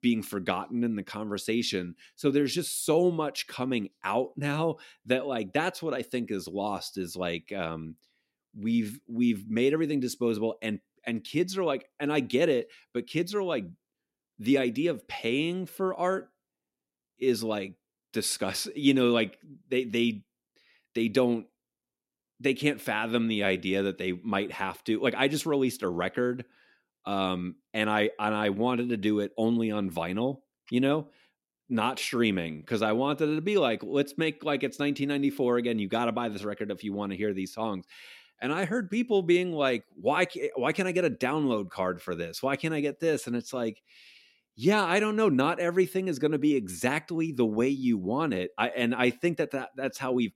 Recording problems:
none

